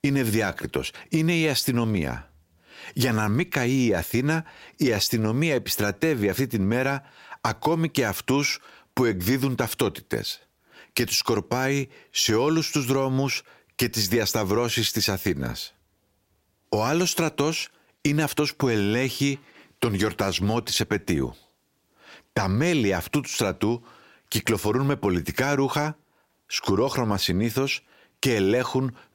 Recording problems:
squashed, flat; somewhat

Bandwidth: 16 kHz